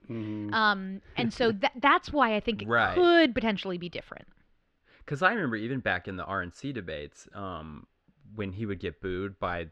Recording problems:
muffled; slightly; fading above 3.5 kHz

